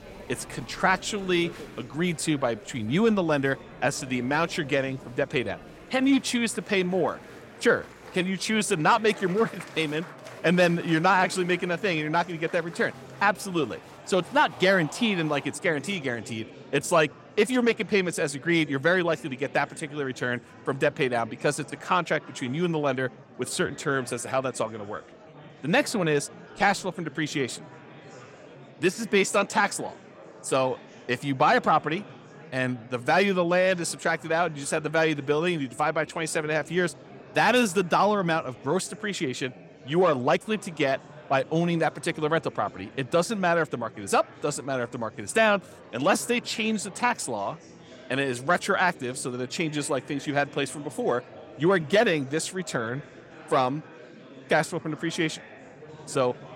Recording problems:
murmuring crowd; noticeable; throughout; 20 dB below the speech

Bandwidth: 16.5 kHz